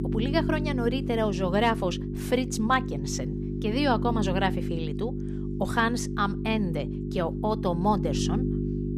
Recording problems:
electrical hum; loud; throughout; 50 Hz, 9 dB below the speech

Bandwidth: 14.5 kHz